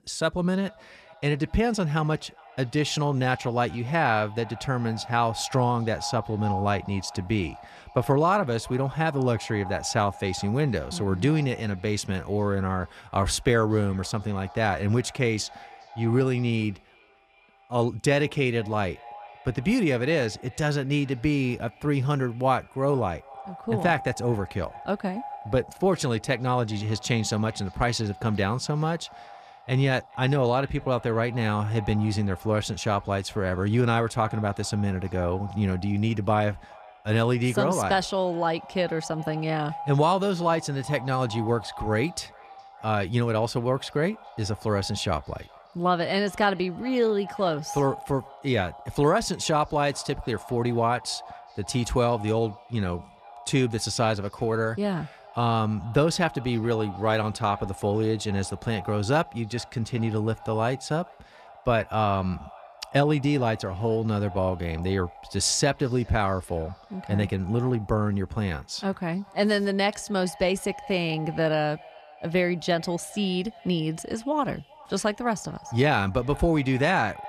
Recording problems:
echo of what is said; faint; throughout; 410 ms later, 20 dB below the speech

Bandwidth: 14.5 kHz